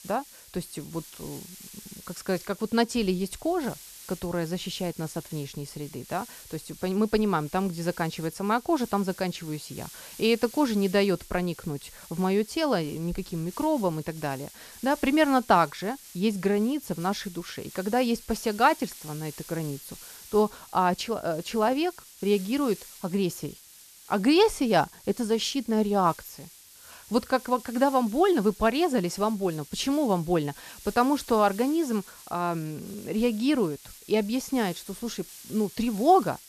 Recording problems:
hiss; noticeable; throughout; 20 dB below the speech

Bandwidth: 14 kHz